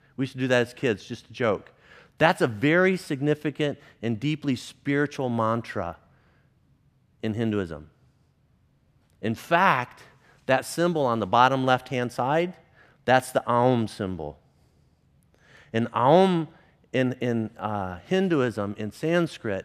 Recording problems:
none

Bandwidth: 14.5 kHz